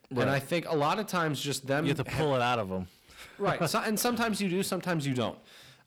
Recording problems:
distortion; slight; 10 dB below the speech

